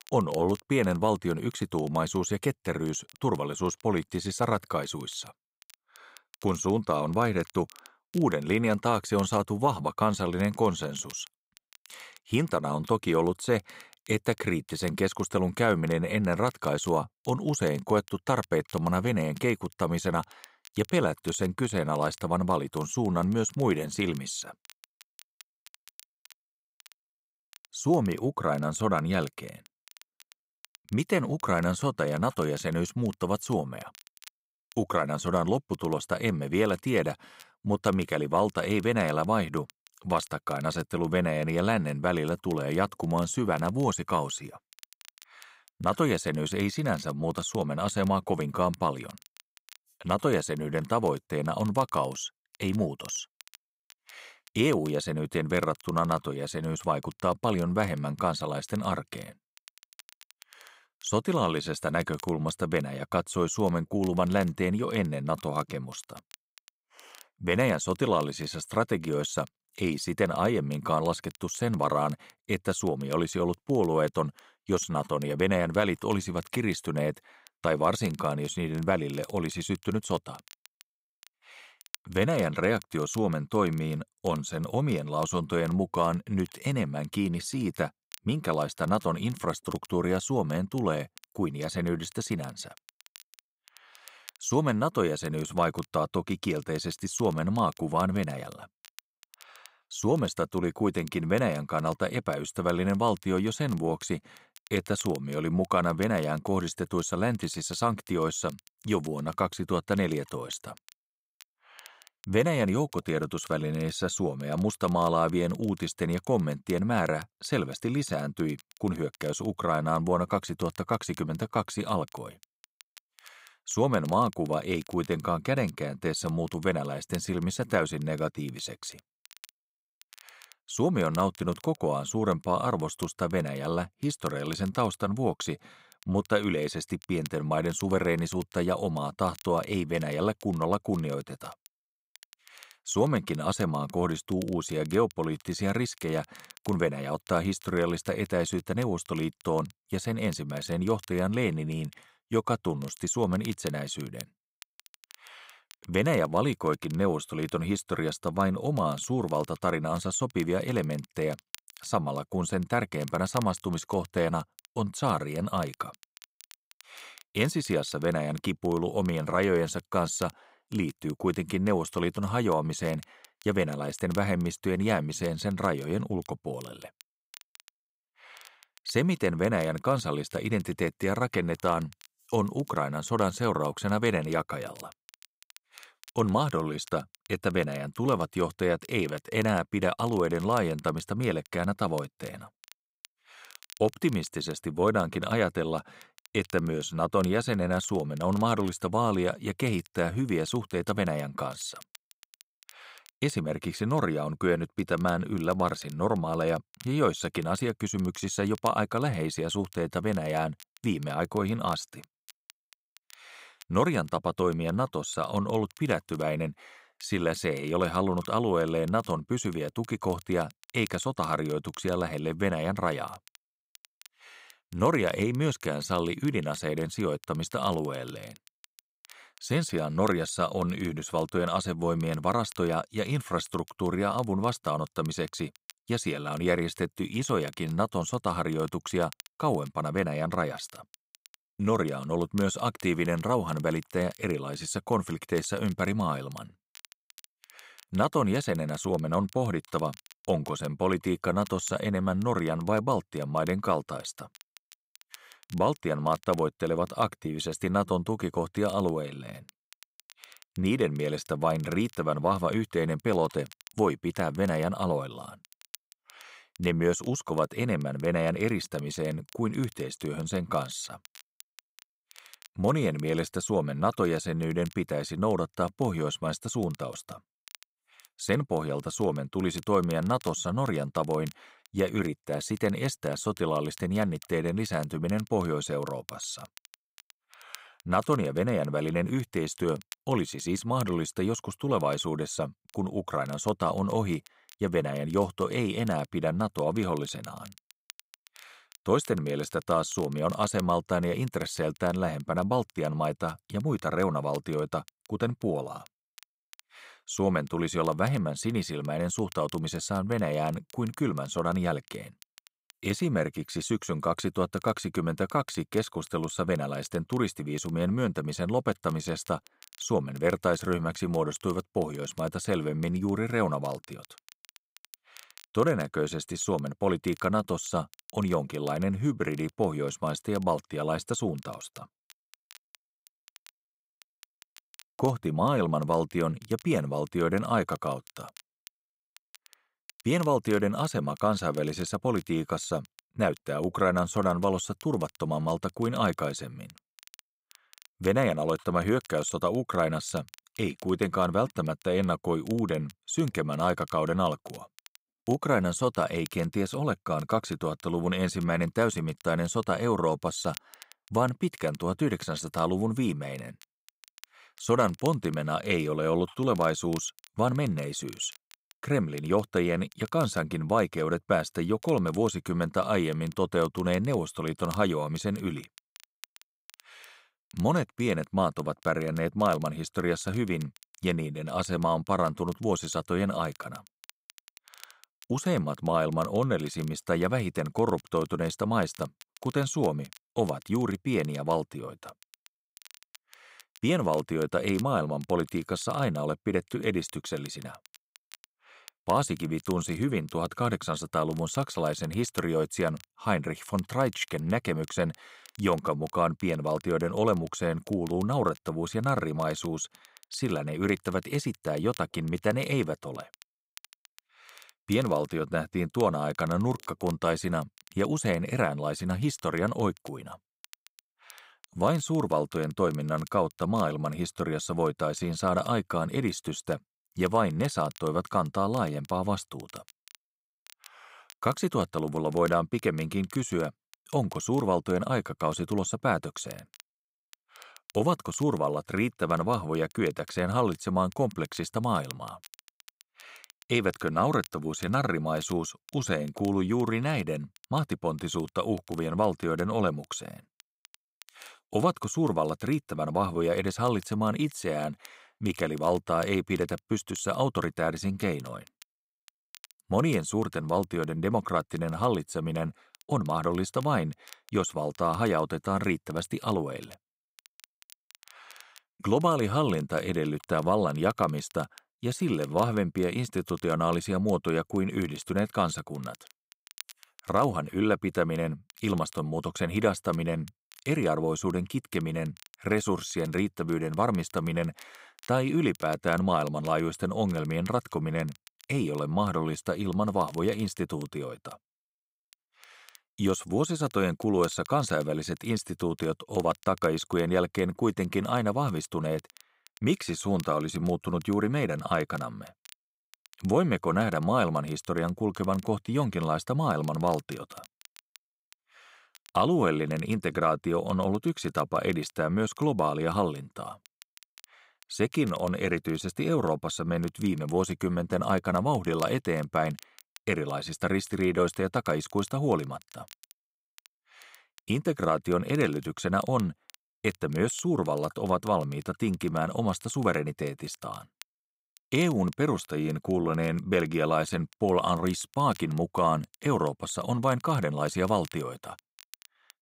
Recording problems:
crackle, like an old record; faint; 25 dB below the speech

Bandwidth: 15.5 kHz